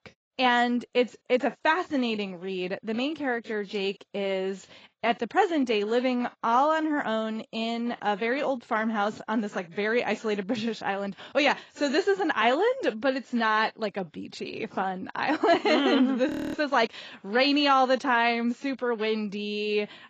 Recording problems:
garbled, watery; badly
audio freezing; at 16 s

